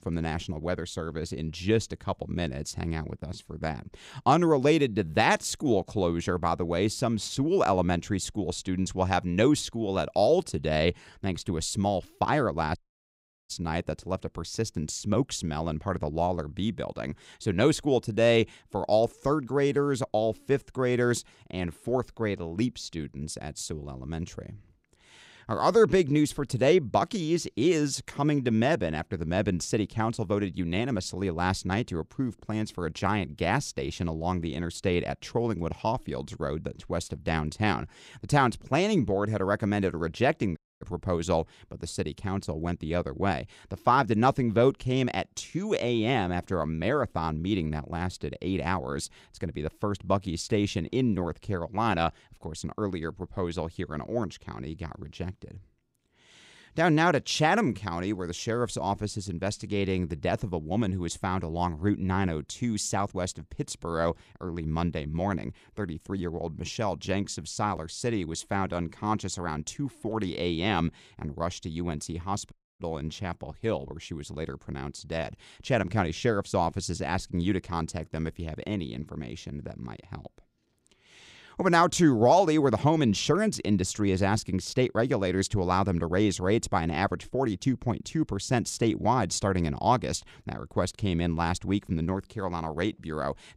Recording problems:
audio cutting out; at 13 s for 0.5 s, at 41 s and at 1:13

